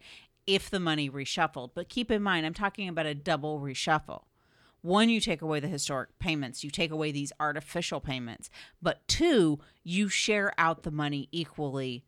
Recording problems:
none

